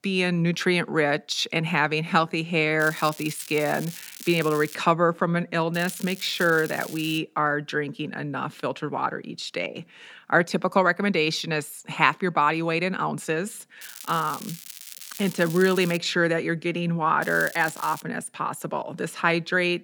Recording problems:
crackling; noticeable; 4 times, first at 3 s; 15 dB below the speech

